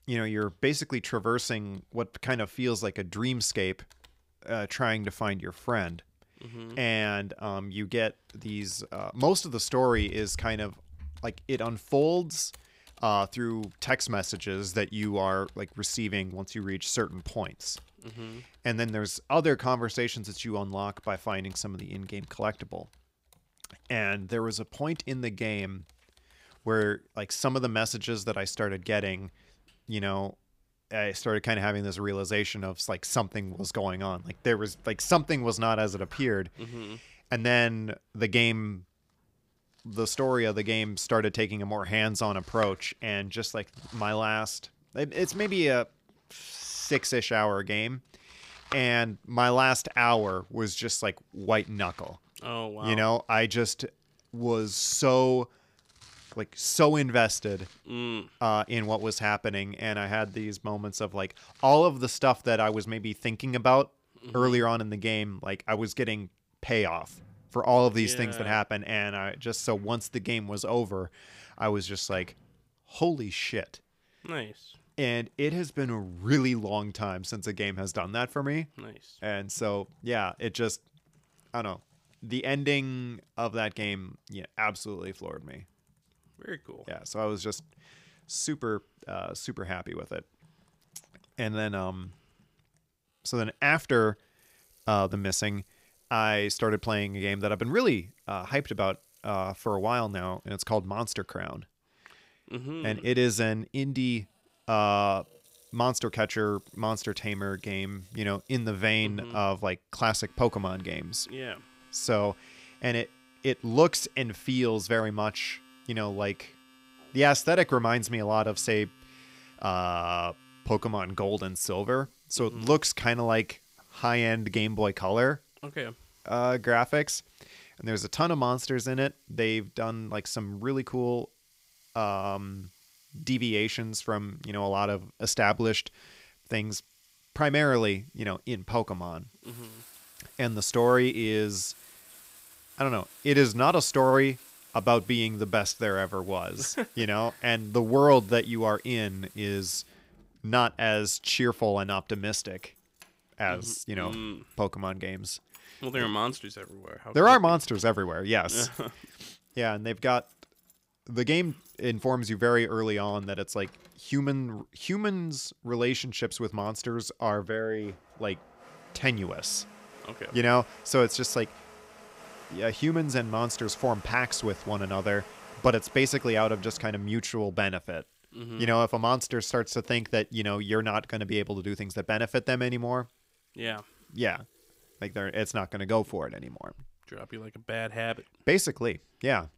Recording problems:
household noises; faint; throughout; 25 dB below the speech

